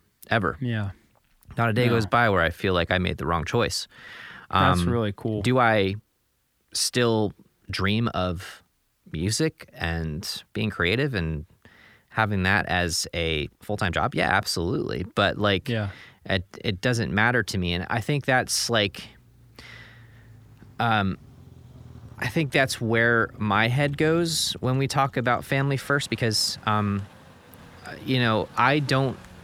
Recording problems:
traffic noise; faint; from 18 s on; 25 dB below the speech
uneven, jittery; strongly; from 2 to 29 s

